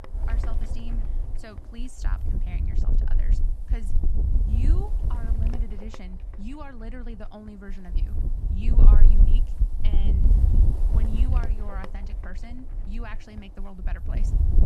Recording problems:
wind noise on the microphone; heavy; as loud as the speech

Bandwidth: 13.5 kHz